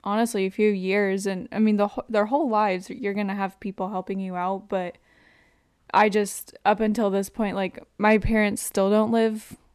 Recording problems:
none

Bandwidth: 13.5 kHz